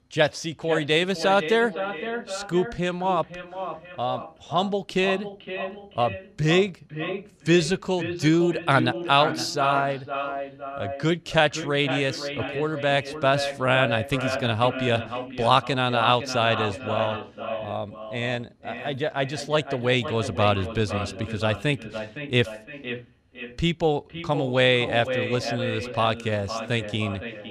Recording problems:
echo of what is said; strong; throughout; 510 ms later, 9 dB below the speech

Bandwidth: 14.5 kHz